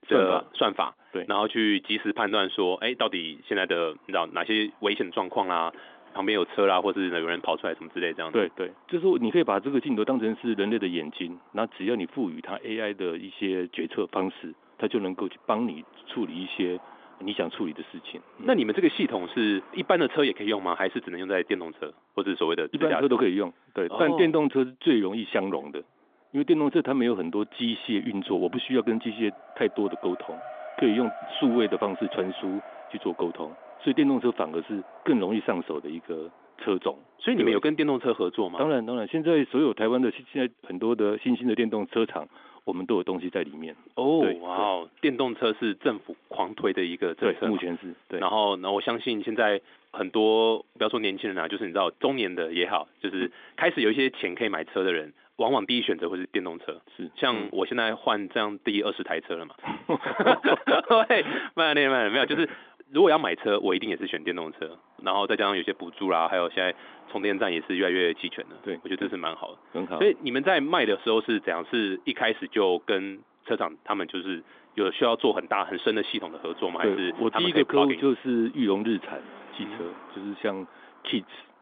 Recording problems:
phone-call audio; nothing above 3.5 kHz
traffic noise; faint; throughout; 20 dB below the speech

